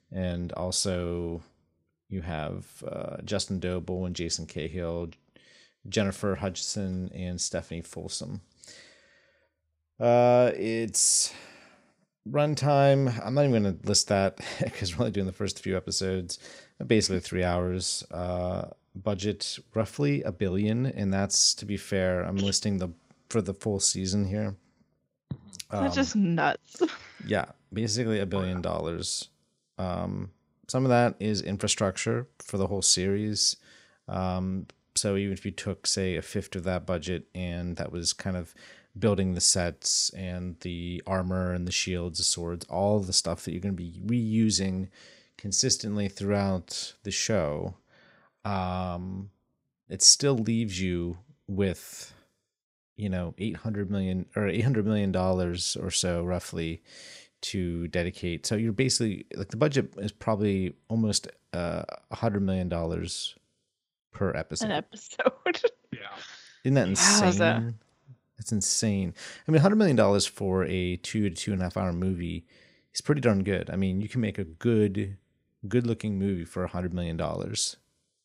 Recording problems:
none

